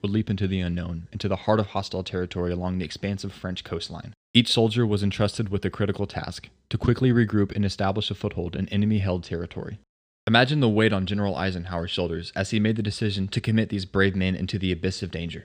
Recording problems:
none

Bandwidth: 15 kHz